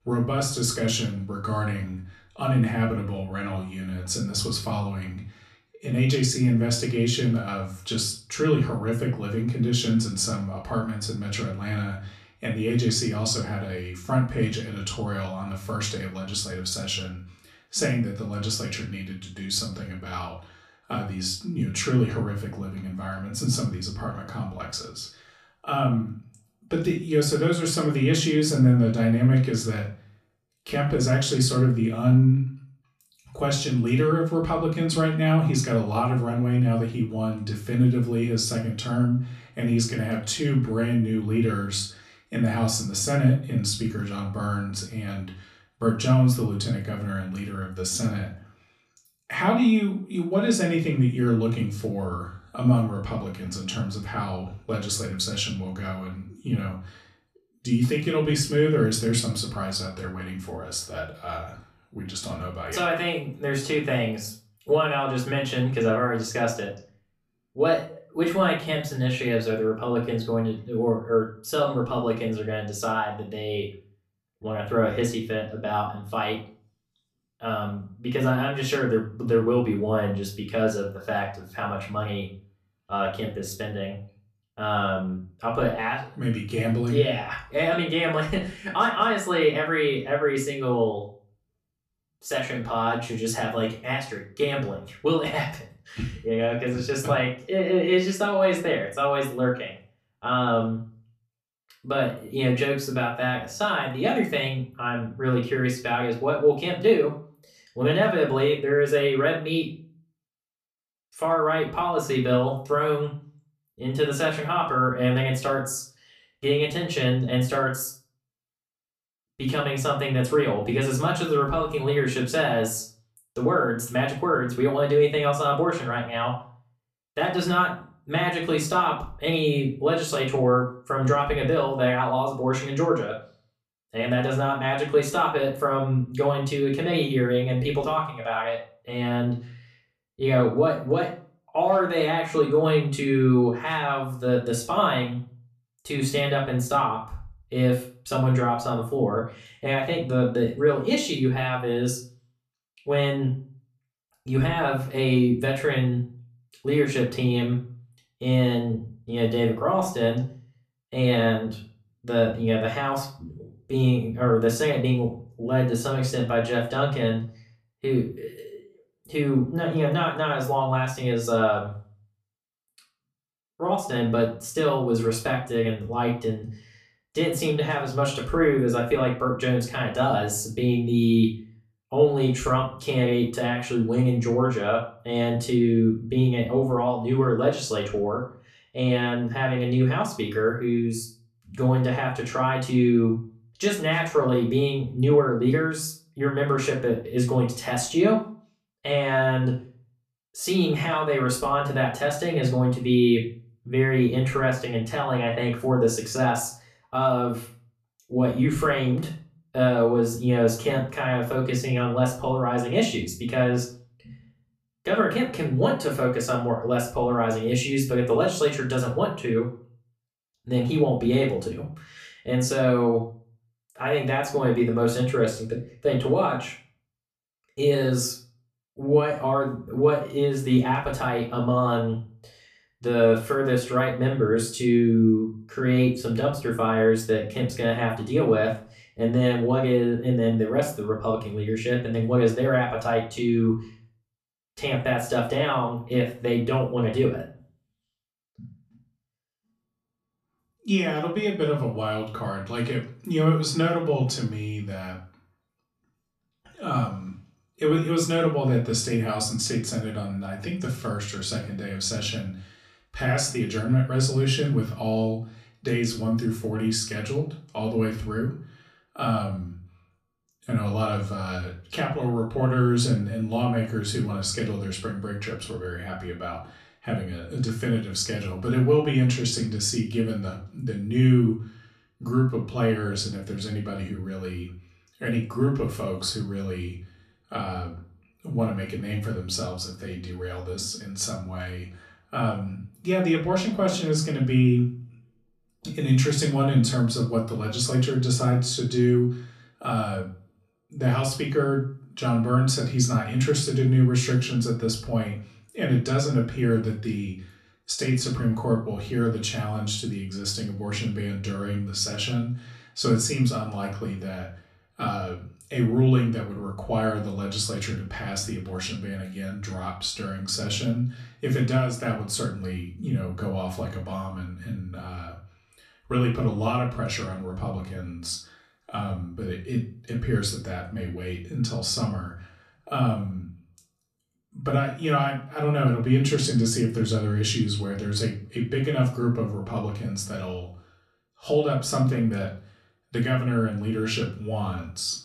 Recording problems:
off-mic speech; far
room echo; slight; dies away in 0.4 s

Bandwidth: 14.5 kHz